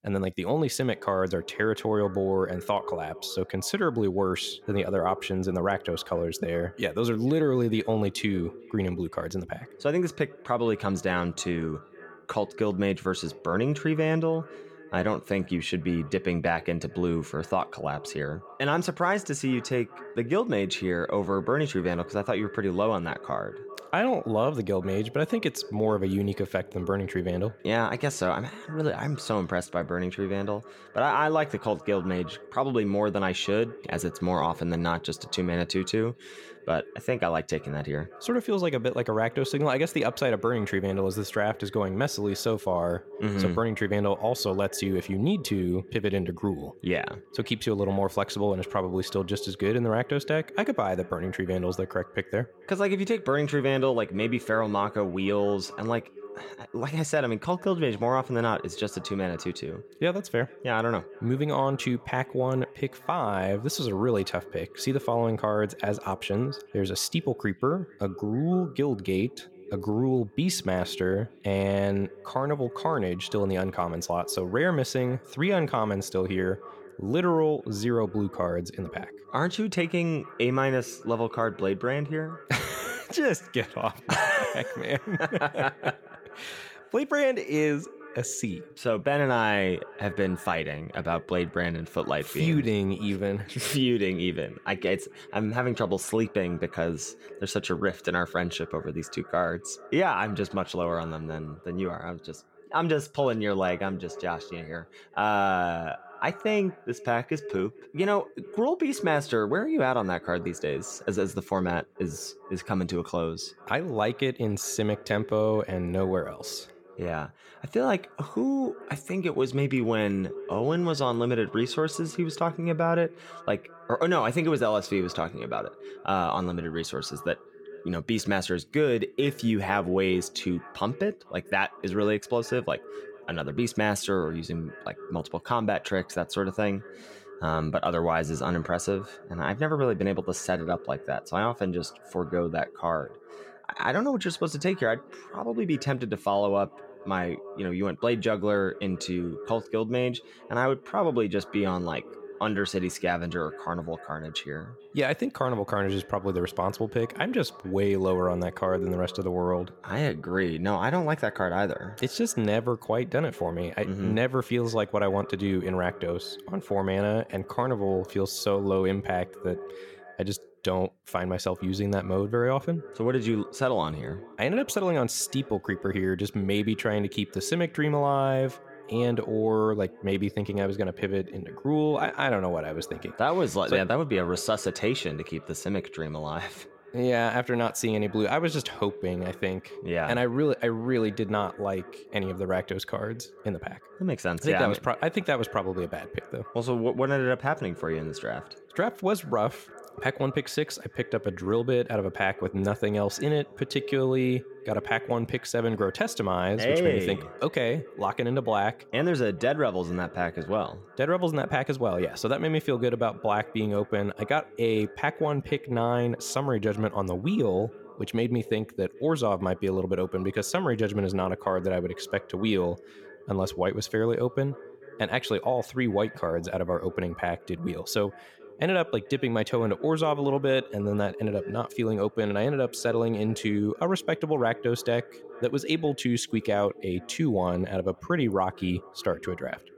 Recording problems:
echo of what is said; noticeable; throughout; 440 ms later, 20 dB below the speech

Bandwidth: 17 kHz